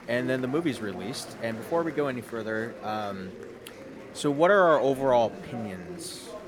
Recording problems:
murmuring crowd; noticeable; throughout; 15 dB below the speech

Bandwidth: 18 kHz